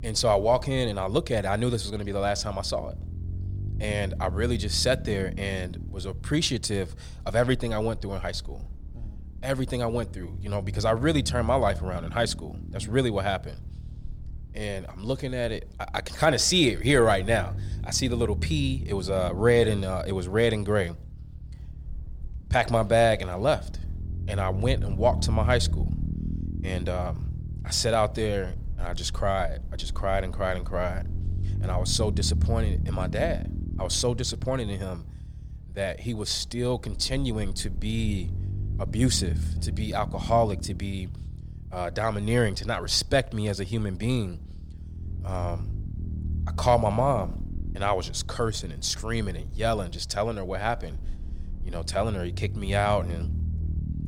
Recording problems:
low rumble; faint; throughout; 20 dB below the speech

